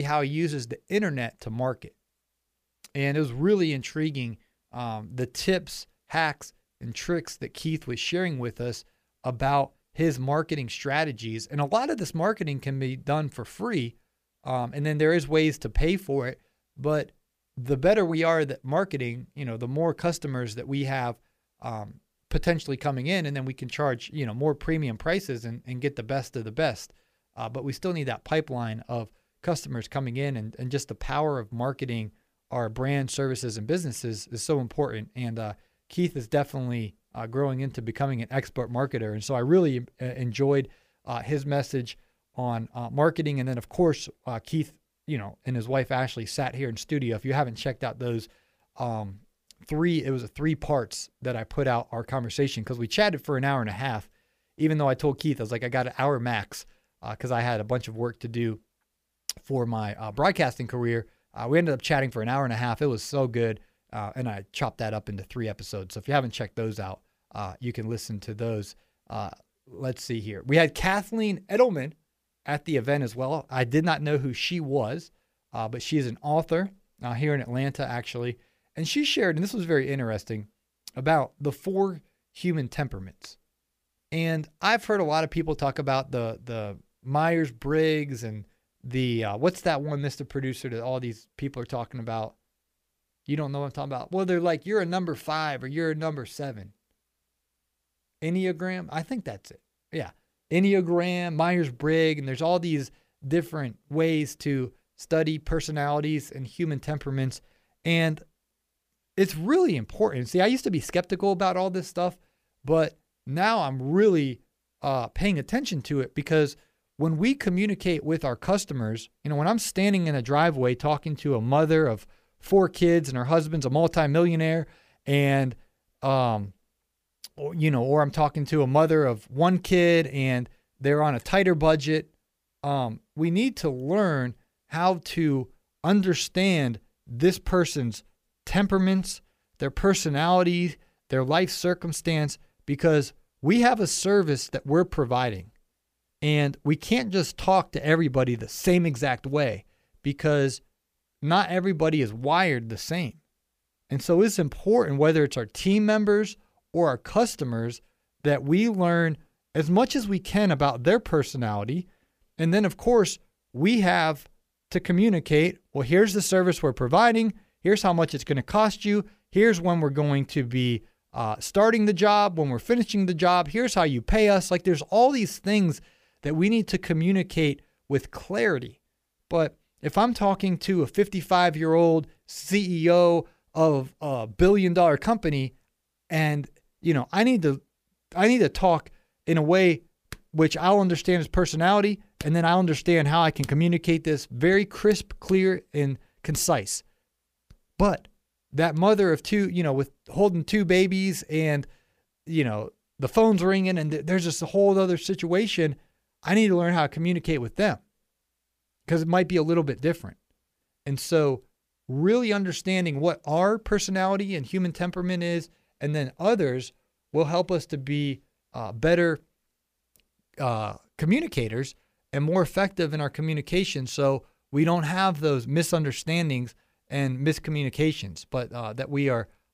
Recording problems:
abrupt cut into speech; at the start

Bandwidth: 15 kHz